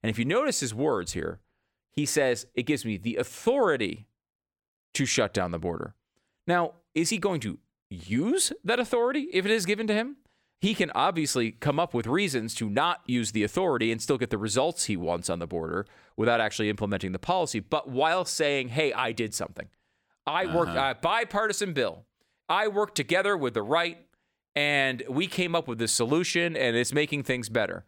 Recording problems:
none

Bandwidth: 17.5 kHz